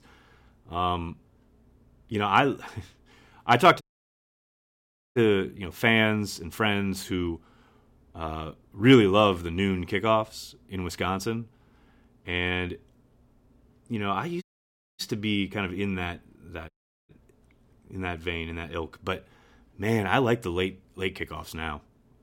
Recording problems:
audio cutting out; at 4 s for 1.5 s, at 14 s for 0.5 s and at 17 s

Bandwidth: 16.5 kHz